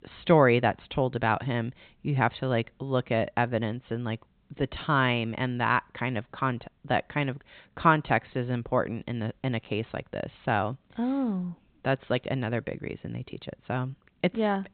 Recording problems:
high frequencies cut off; severe; nothing above 4 kHz

